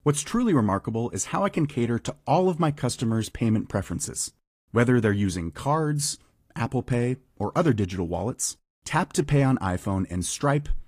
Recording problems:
garbled, watery; slightly; nothing above 15.5 kHz

